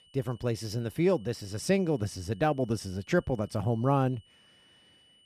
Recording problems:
high-pitched whine; faint; throughout; 3 kHz, 30 dB below the speech

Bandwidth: 14.5 kHz